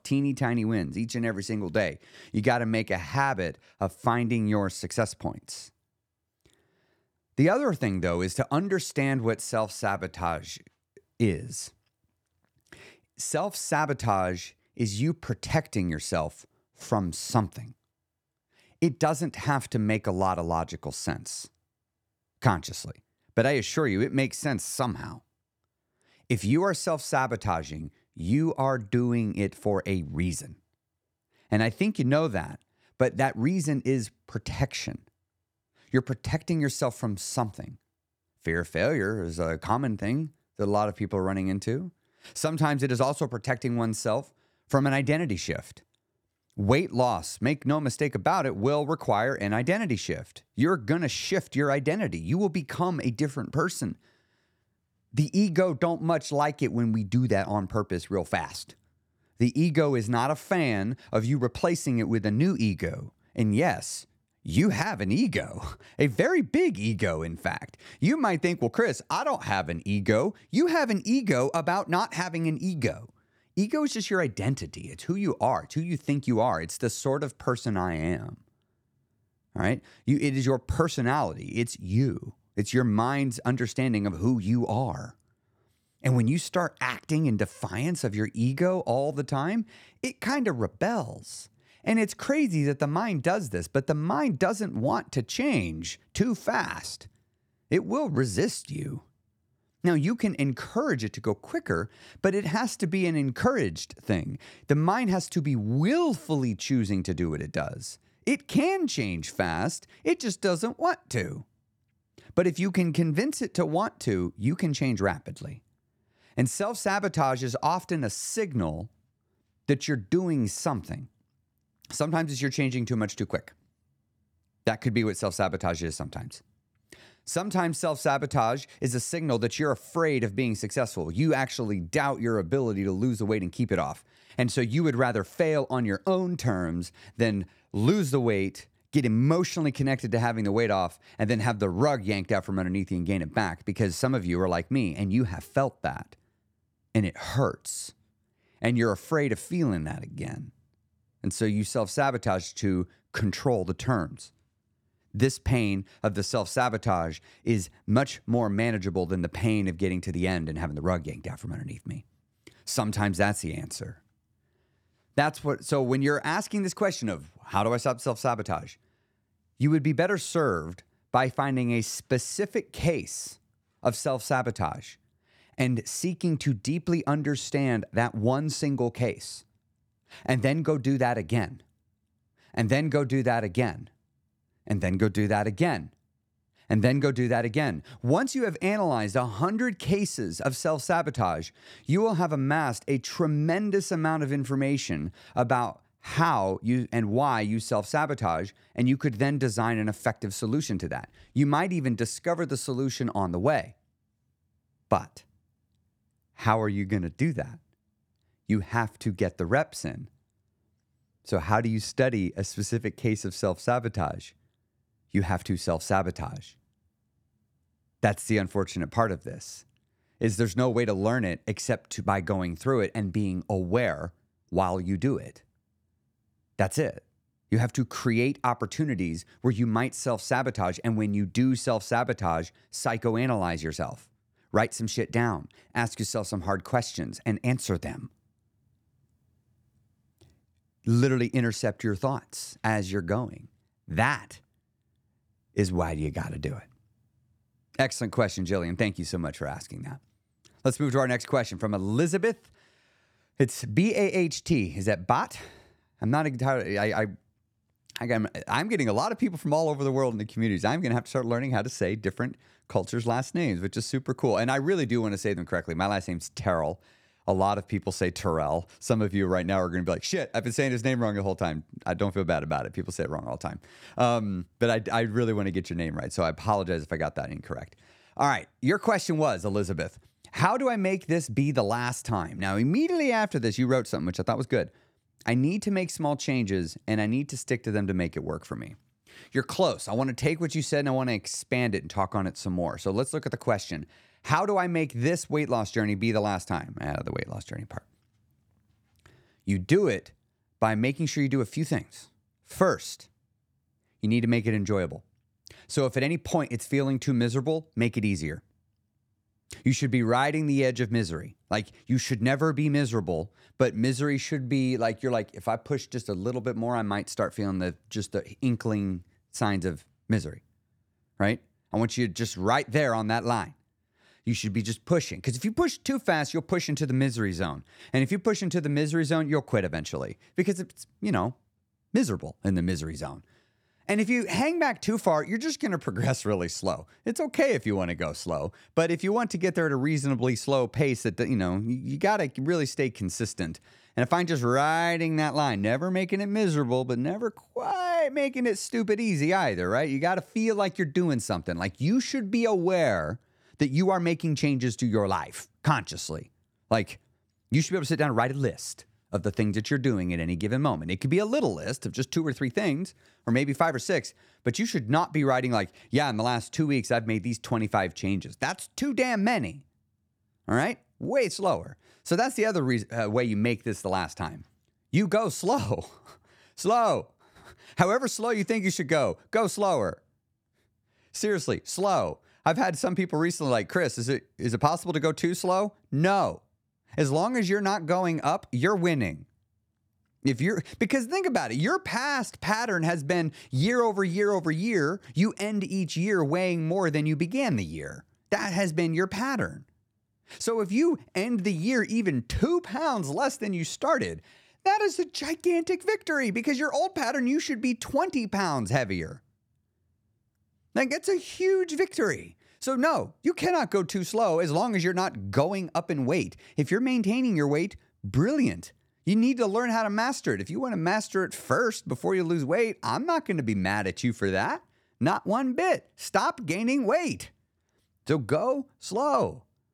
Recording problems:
none

